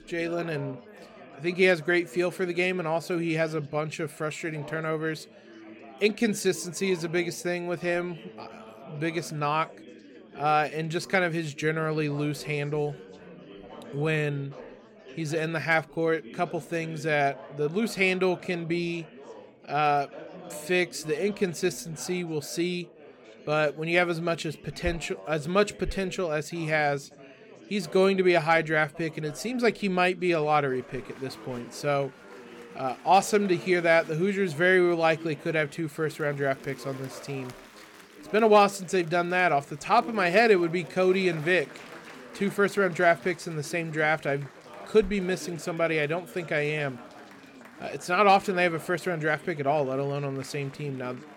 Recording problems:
chatter from many people; noticeable; throughout; 20 dB below the speech

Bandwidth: 17 kHz